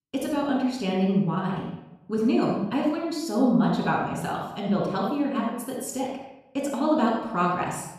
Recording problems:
off-mic speech; far
room echo; noticeable; dies away in 0.7 s

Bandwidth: 14.5 kHz